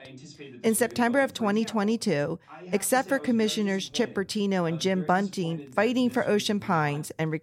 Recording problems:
voice in the background; noticeable; throughout; 20 dB below the speech

